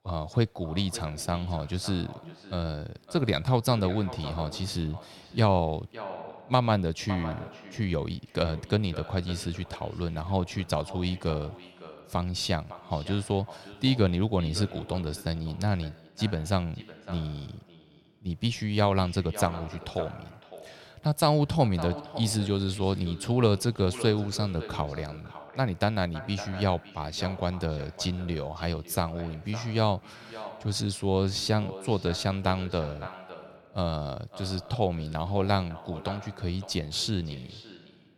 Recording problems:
echo of what is said; noticeable; throughout; 560 ms later, 15 dB below the speech

